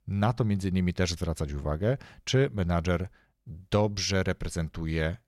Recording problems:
none

